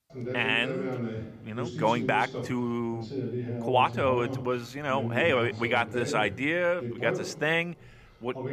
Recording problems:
voice in the background; loud; throughout; 7 dB below the speech

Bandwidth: 15 kHz